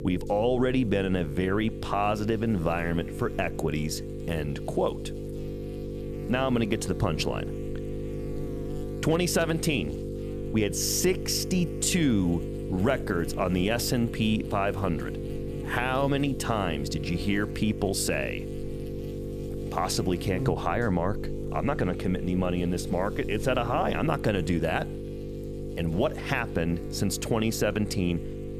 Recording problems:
electrical hum; loud; throughout; 50 Hz, 10 dB below the speech

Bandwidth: 14.5 kHz